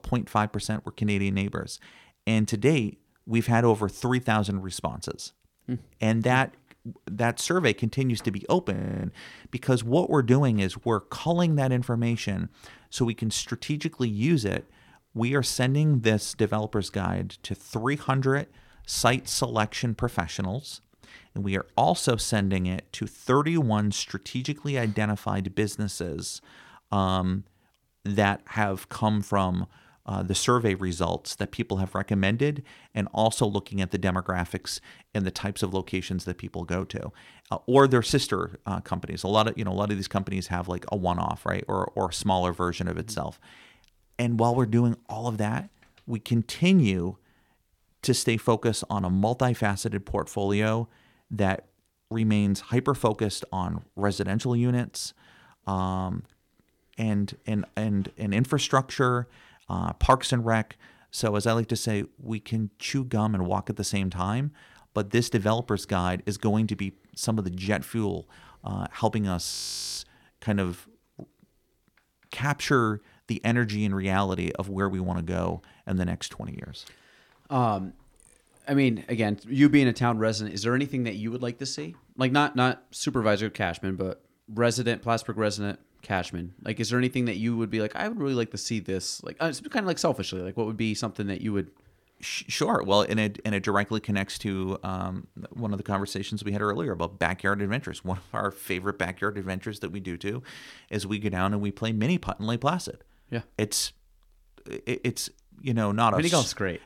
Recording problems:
audio freezing; at 9 s and at 1:10

